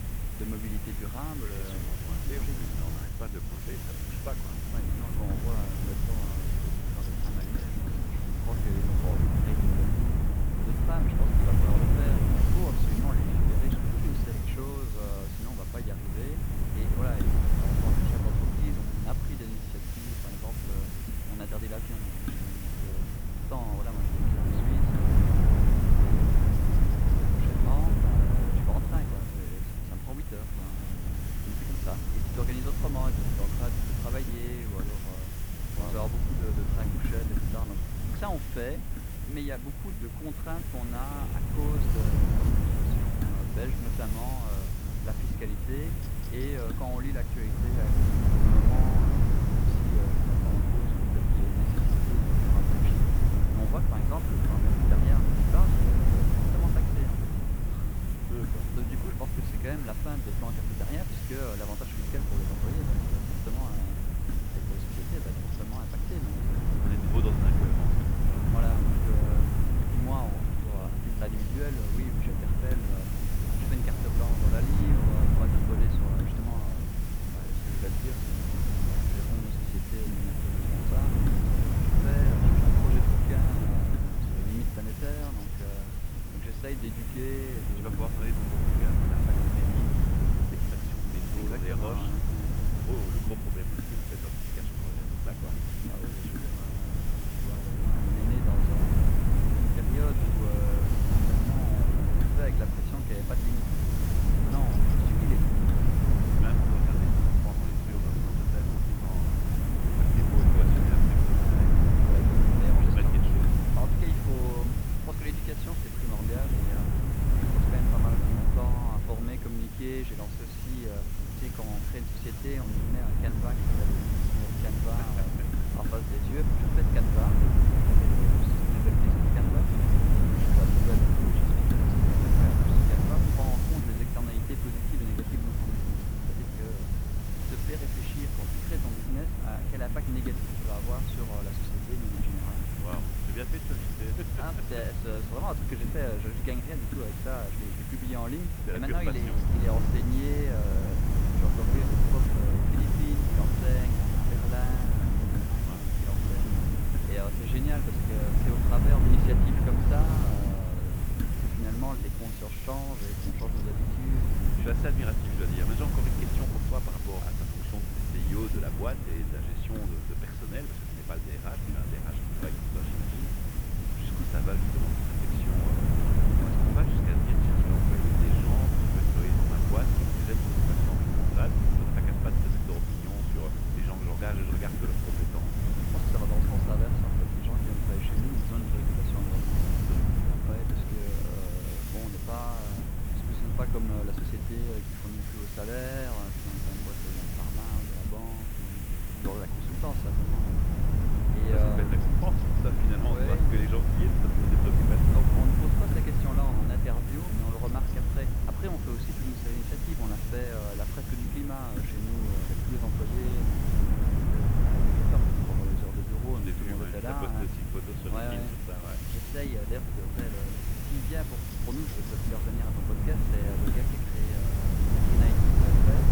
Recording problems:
muffled; slightly; fading above 2 kHz
wind noise on the microphone; heavy; 2 dB above the speech
hiss; loud; throughout; 1 dB below the speech
electrical hum; faint; throughout; 60 Hz, 20 dB below the speech

